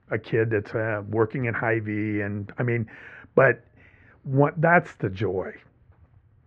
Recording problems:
muffled; very; fading above 2 kHz

